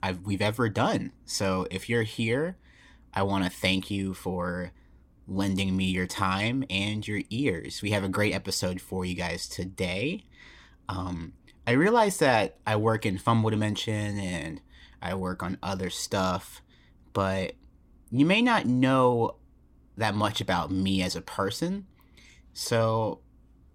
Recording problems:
none

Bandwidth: 16.5 kHz